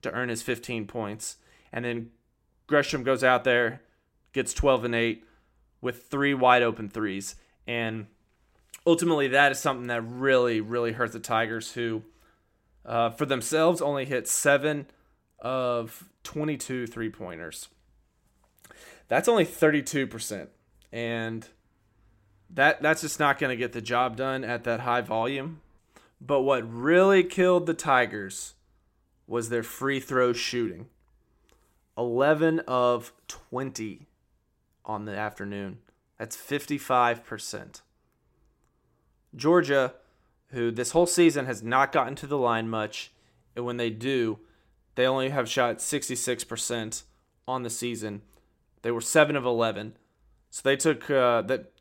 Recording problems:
none

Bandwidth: 16 kHz